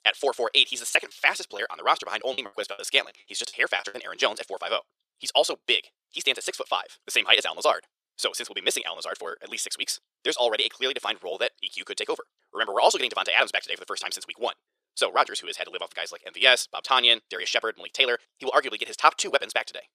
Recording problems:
thin; very; fading below 450 Hz
wrong speed, natural pitch; too fast; 1.7 times normal speed
choppy; very; from 1 to 4 s; 13% of the speech affected

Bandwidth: 14.5 kHz